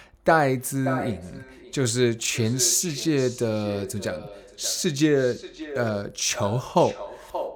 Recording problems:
echo of what is said; noticeable; throughout; 580 ms later, 15 dB below the speech

